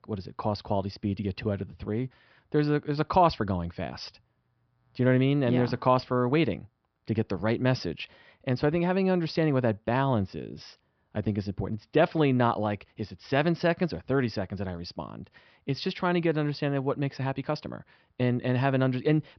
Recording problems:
high frequencies cut off; noticeable; nothing above 5.5 kHz

